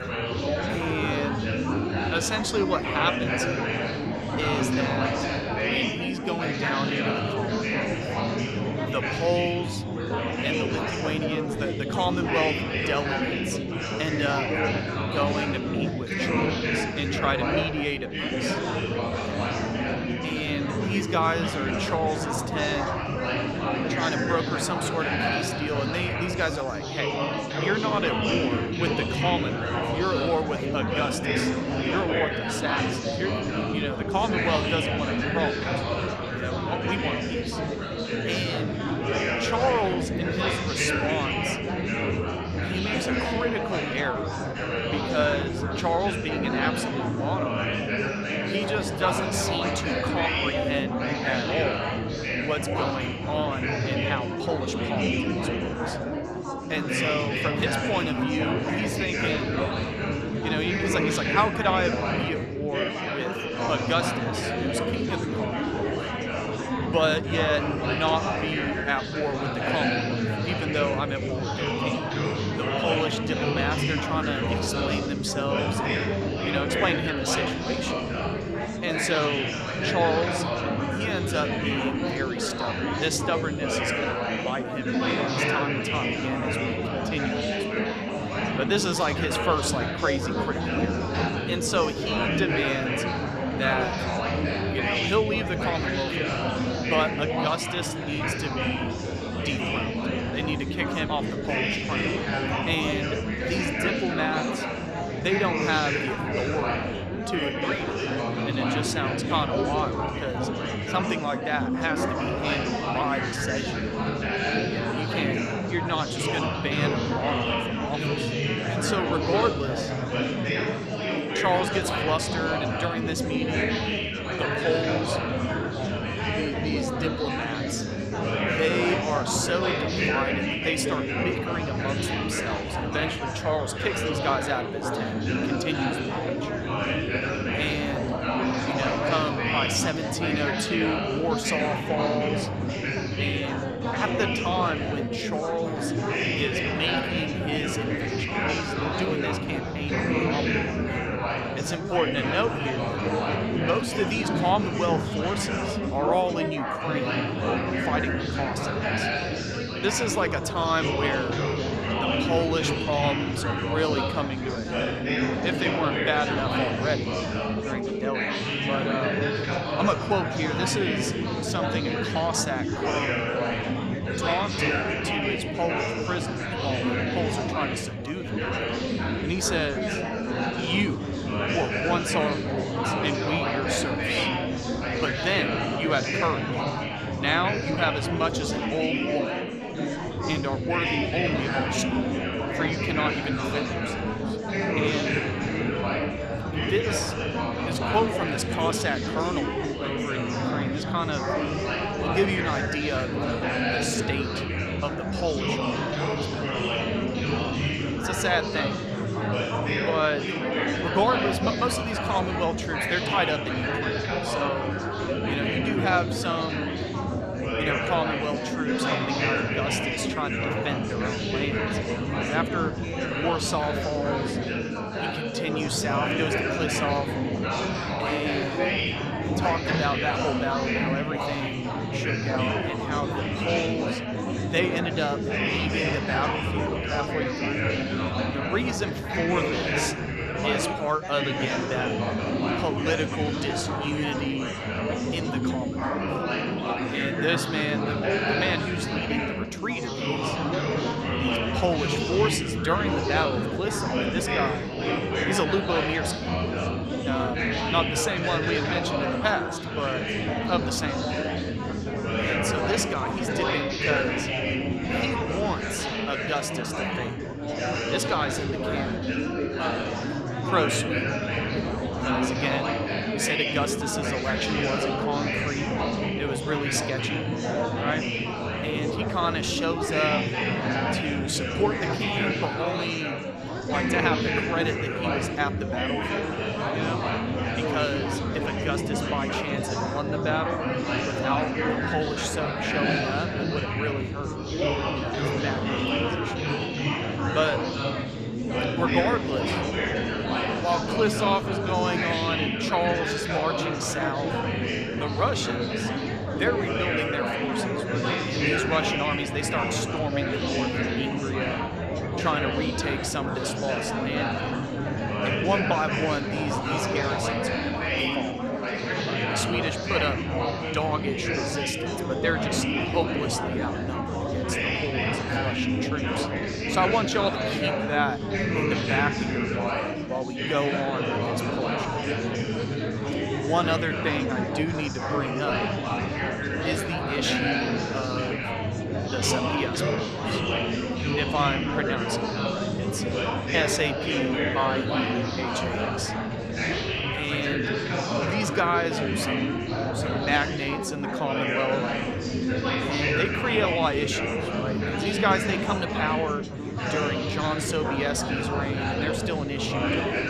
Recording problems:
chatter from many people; very loud; throughout; 2 dB above the speech

